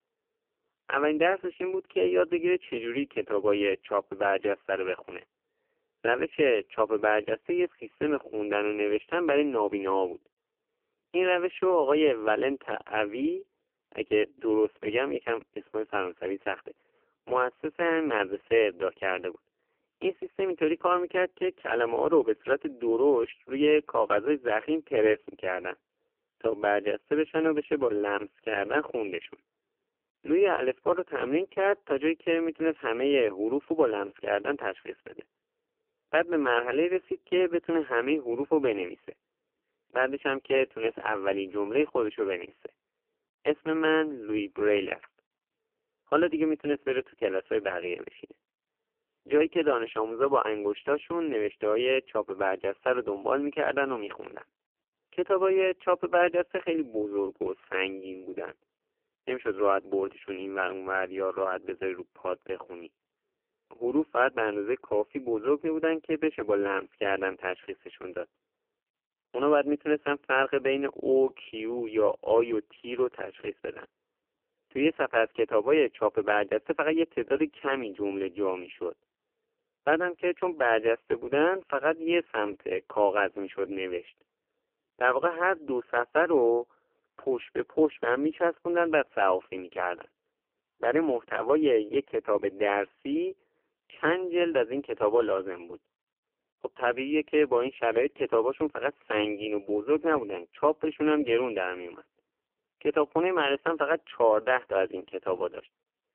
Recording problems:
phone-call audio; poor line; nothing above 3 kHz

